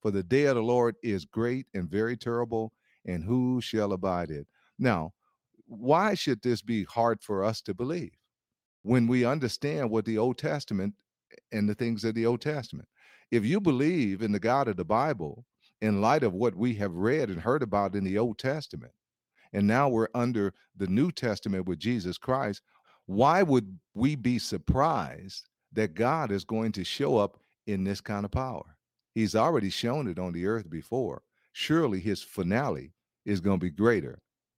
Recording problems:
none

